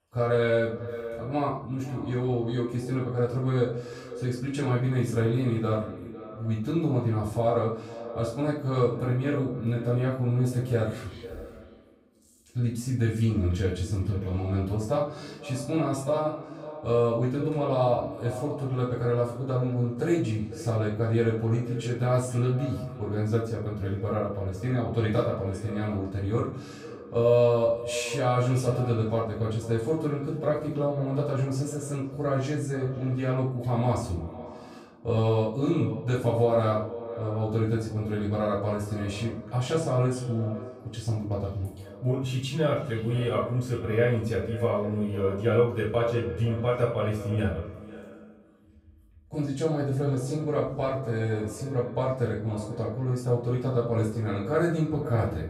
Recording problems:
off-mic speech; far
echo of what is said; noticeable; throughout; 500 ms later, 15 dB below the speech
room echo; noticeable; dies away in 0.4 s

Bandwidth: 15.5 kHz